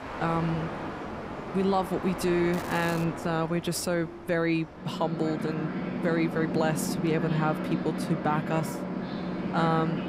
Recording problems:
train or aircraft noise; loud; throughout; 5 dB below the speech
crackling; noticeable; at 2.5 s; 15 dB below the speech

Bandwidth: 15.5 kHz